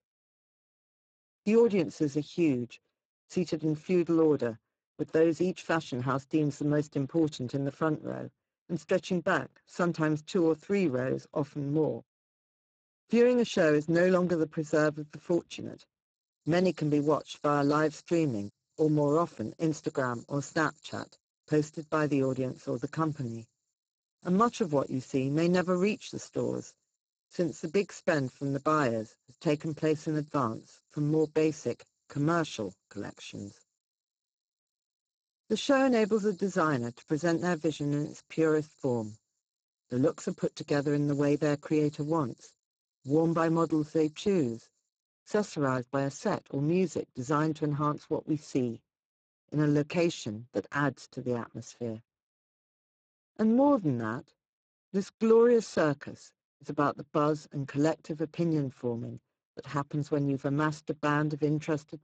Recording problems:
garbled, watery; badly; nothing above 7.5 kHz
high-pitched whine; very faint; from 16 to 45 s; 7 kHz, 70 dB below the speech

